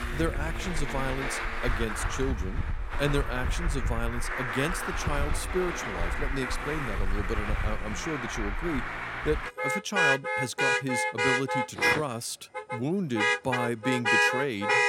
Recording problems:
traffic noise; very loud; throughout; 3 dB above the speech

